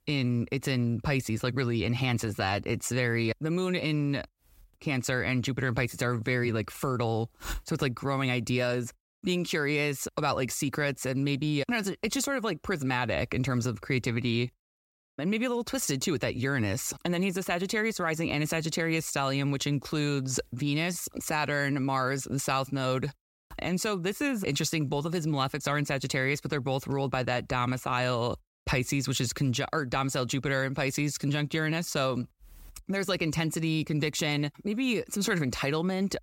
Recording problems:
none

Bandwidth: 16 kHz